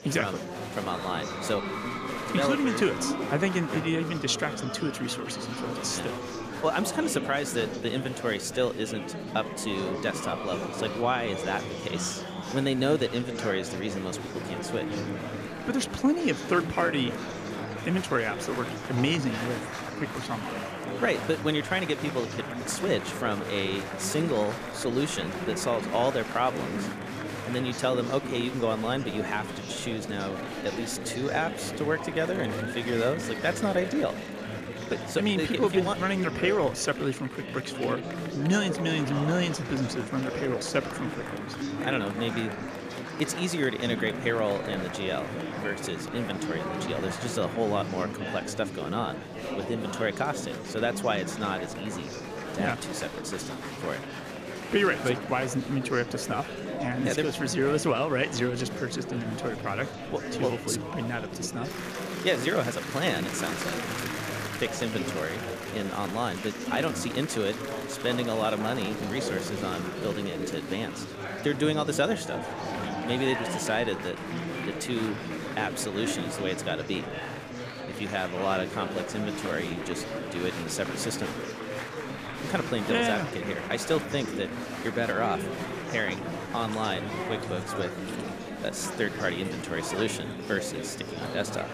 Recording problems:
murmuring crowd; loud; throughout; 5 dB below the speech

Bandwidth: 14.5 kHz